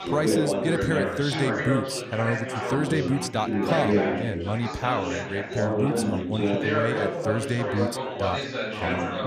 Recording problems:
chatter from many people; very loud; throughout; 2 dB above the speech

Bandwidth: 14.5 kHz